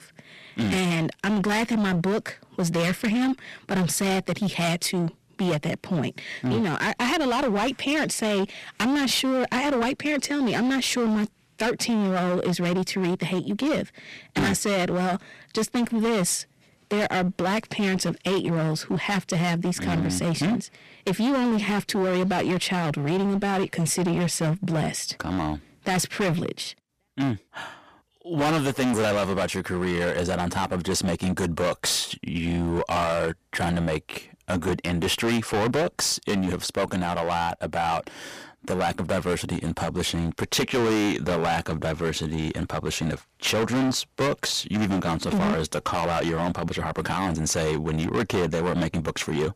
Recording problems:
distortion; heavy; 20% of the sound clipped

